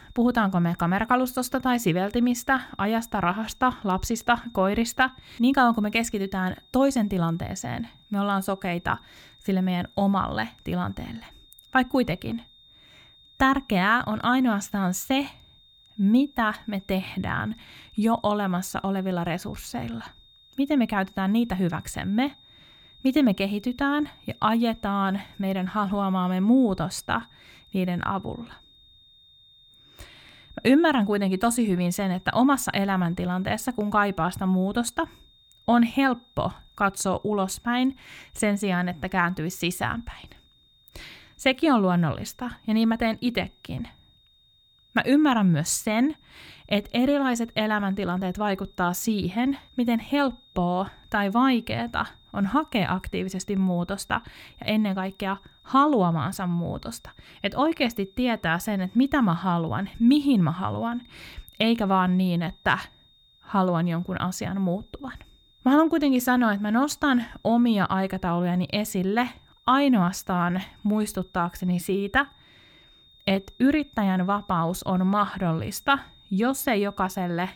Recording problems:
high-pitched whine; faint; throughout; 3.5 kHz, 30 dB below the speech

